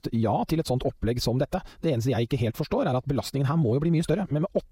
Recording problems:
wrong speed, natural pitch; too fast; 1.5 times normal speed

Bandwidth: 16 kHz